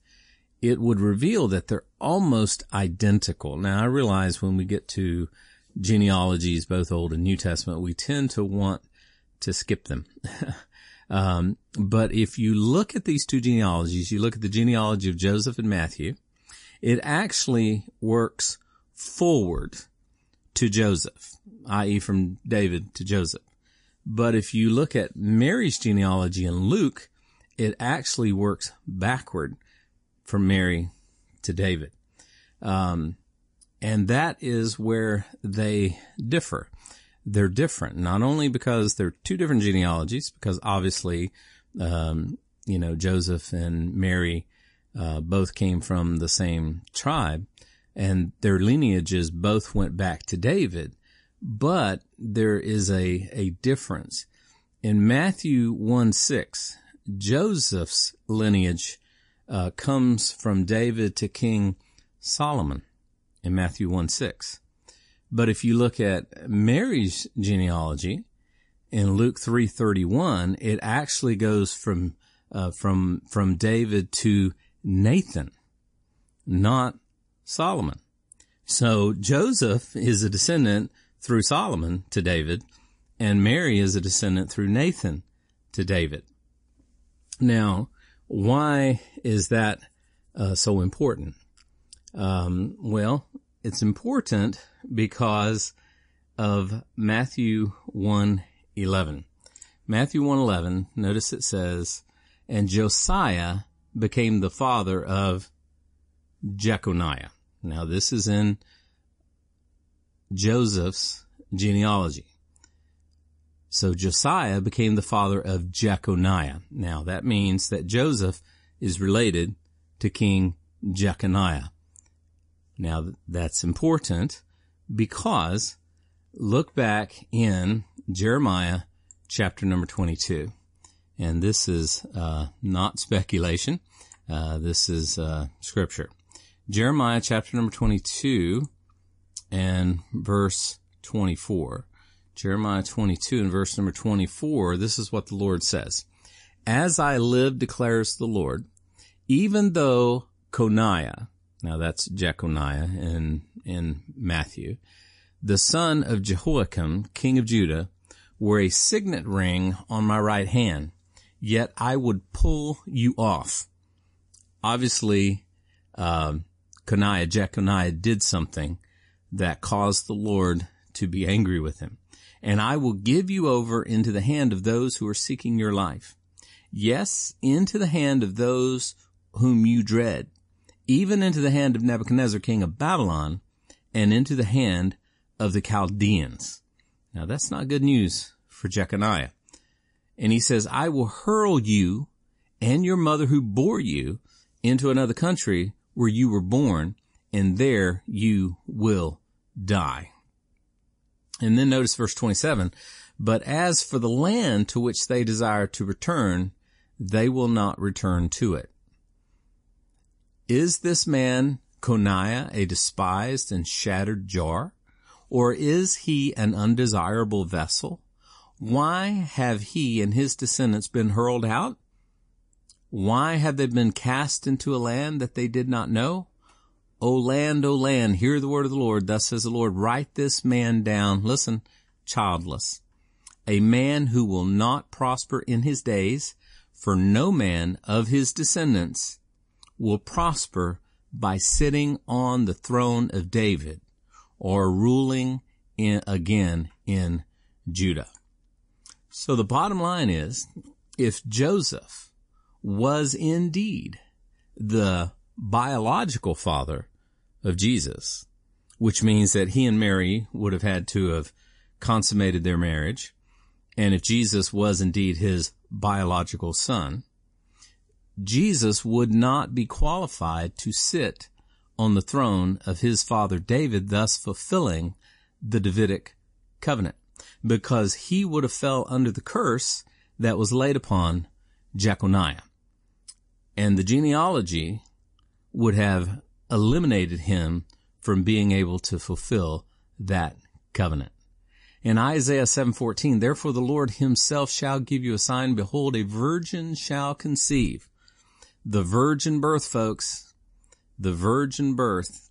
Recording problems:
garbled, watery; slightly; nothing above 10.5 kHz

